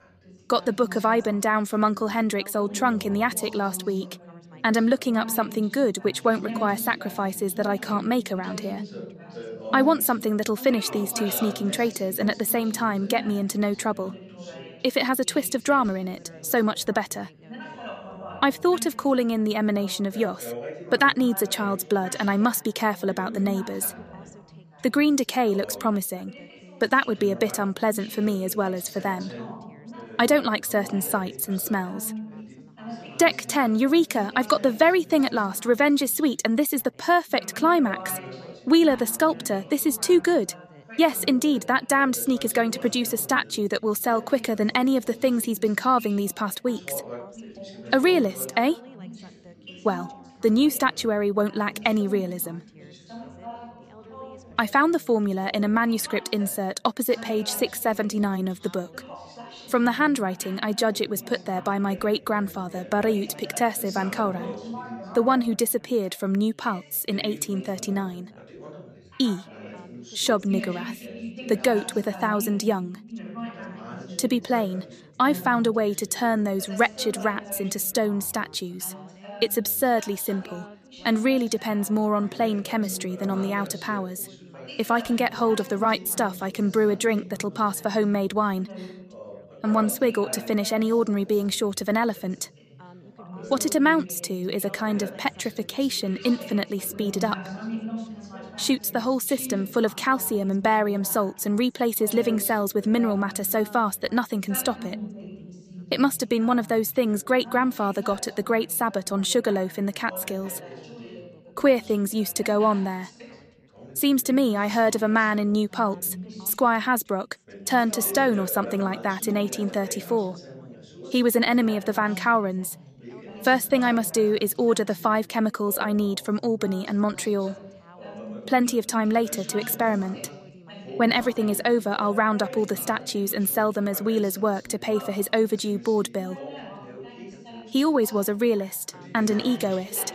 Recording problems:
background chatter; noticeable; throughout; 3 voices, 15 dB below the speech

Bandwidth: 14.5 kHz